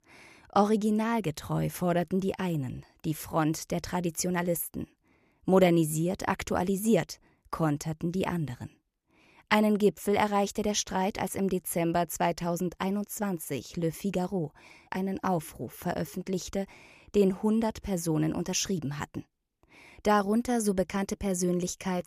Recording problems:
none

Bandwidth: 14.5 kHz